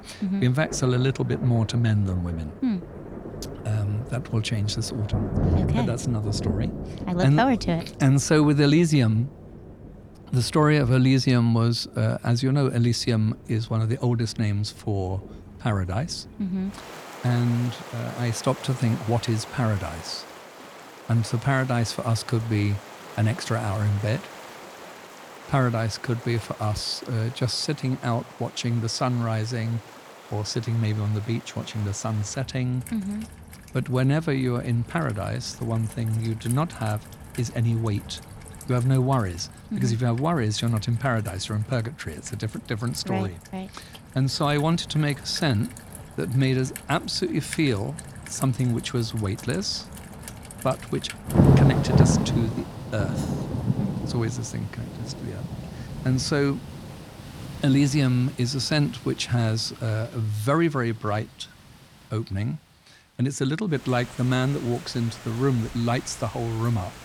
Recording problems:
rain or running water; loud; throughout; 8 dB below the speech

